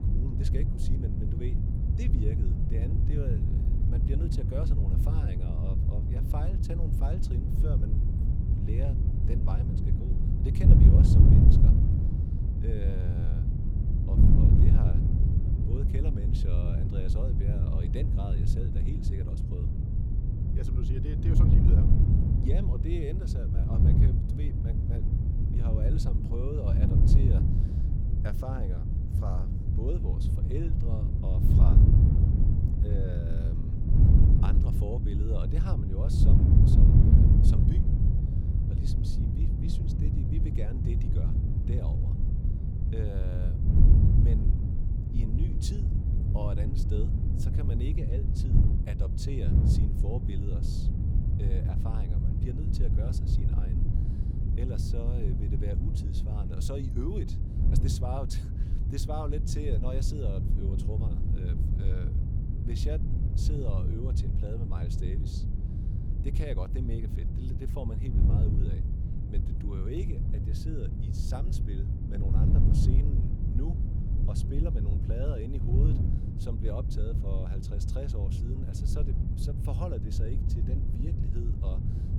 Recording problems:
wind noise on the microphone; heavy; 3 dB above the speech

